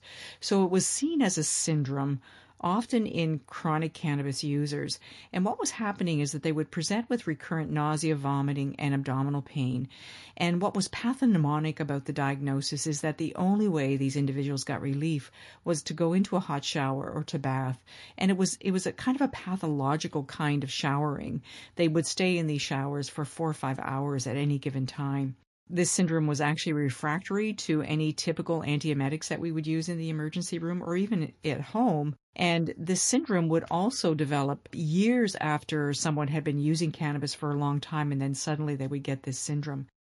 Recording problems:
garbled, watery; slightly; nothing above 11 kHz

